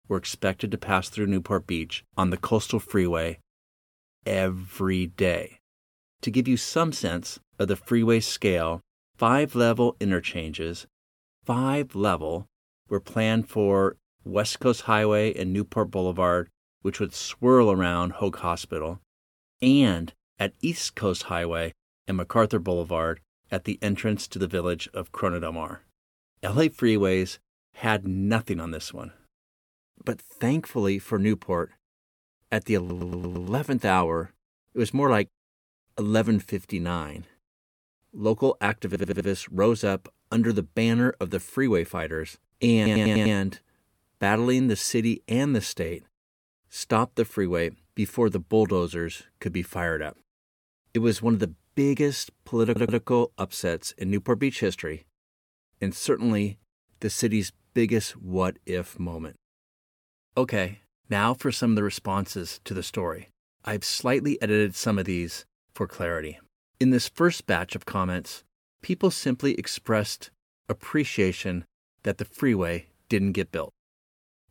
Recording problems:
audio stuttering; 4 times, first at 33 s

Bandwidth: 18.5 kHz